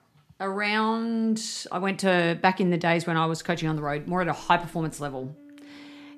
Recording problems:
background music; faint; from 3.5 s on; 25 dB below the speech

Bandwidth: 14.5 kHz